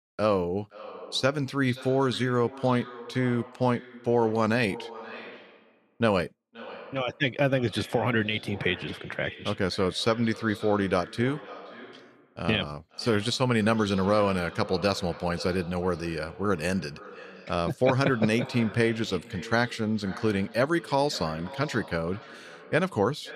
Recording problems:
echo of what is said; noticeable; throughout; 520 ms later, 15 dB below the speech

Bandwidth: 14 kHz